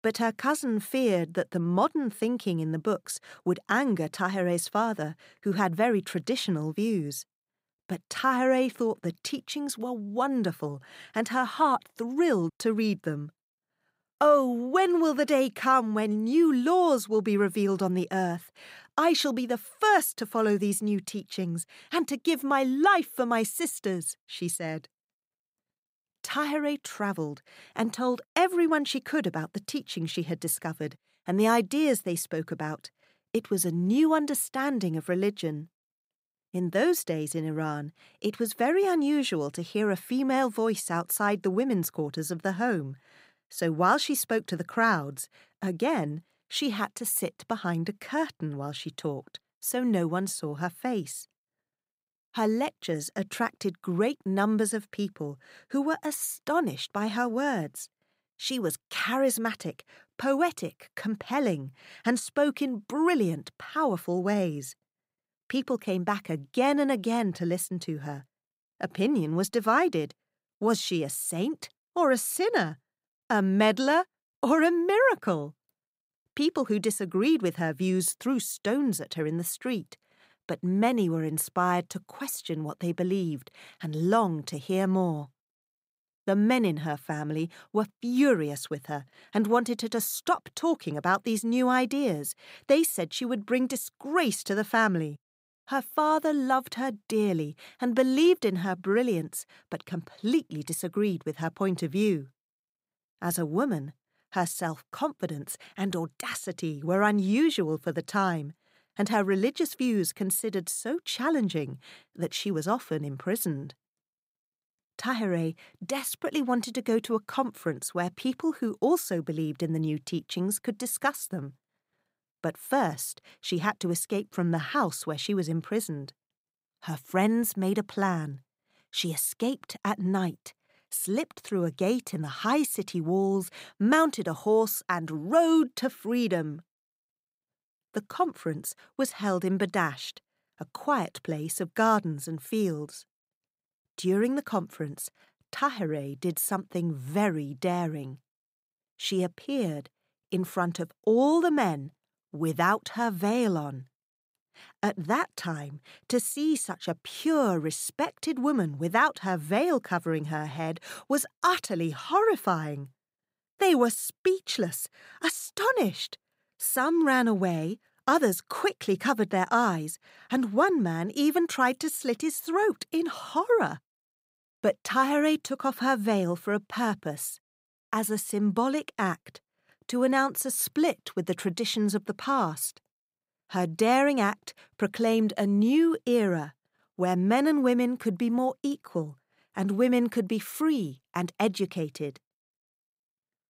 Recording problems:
none

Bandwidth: 15.5 kHz